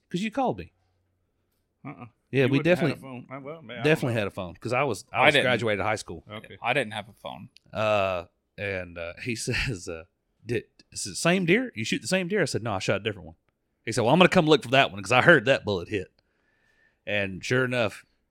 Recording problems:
none

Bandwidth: 16.5 kHz